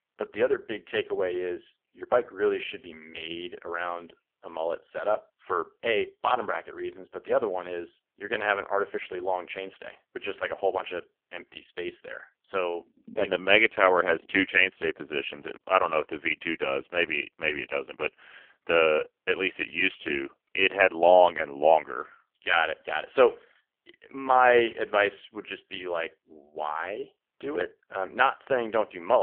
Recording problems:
phone-call audio; poor line; nothing above 3 kHz
abrupt cut into speech; at the end

